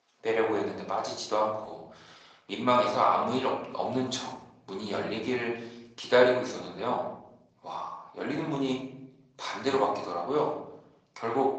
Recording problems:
off-mic speech; far
room echo; noticeable; dies away in 0.7 s
thin; somewhat; fading below 550 Hz
garbled, watery; slightly; nothing above 7.5 kHz

